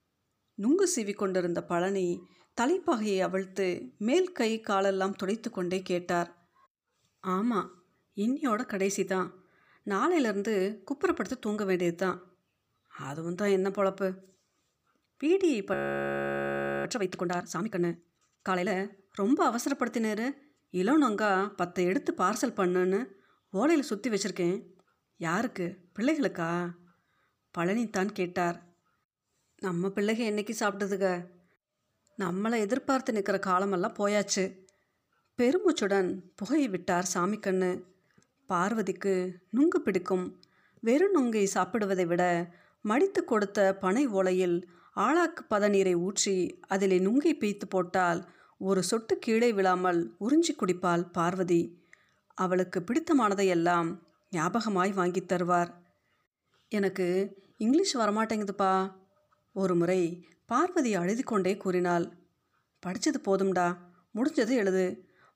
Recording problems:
audio freezing; at 16 s for 1 s

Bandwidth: 15 kHz